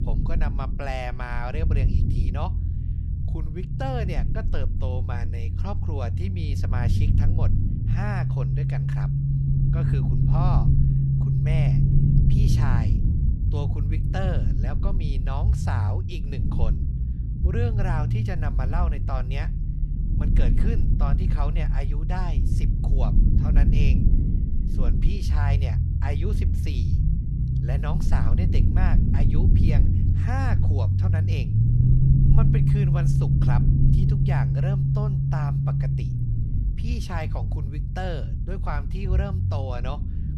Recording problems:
low rumble; loud; throughout; as loud as the speech

